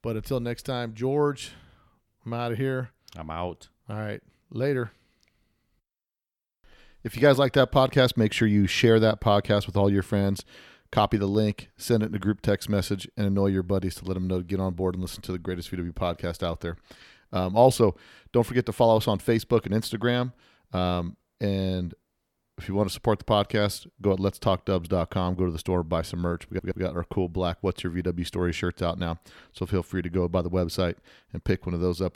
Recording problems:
audio stuttering; at 26 s

